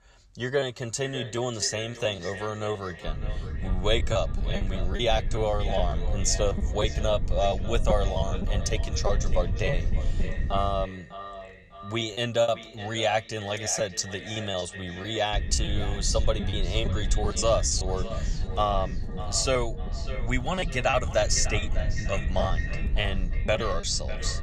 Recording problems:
echo of what is said; noticeable; throughout; 600 ms later, 10 dB below the speech
low rumble; noticeable; from 3 to 11 s and from 15 s on; 20 dB below the speech
choppy; very; 9% of the speech affected

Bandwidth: 14.5 kHz